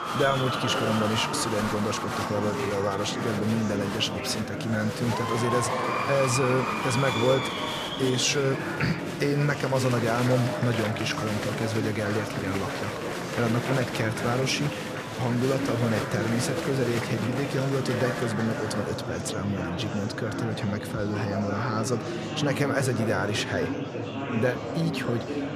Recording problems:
murmuring crowd; loud; throughout; 2 dB below the speech

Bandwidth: 14.5 kHz